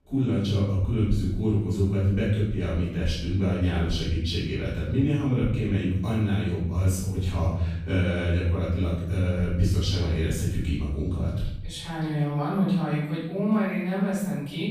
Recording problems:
room echo; strong; dies away in 0.9 s
off-mic speech; far

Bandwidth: 15 kHz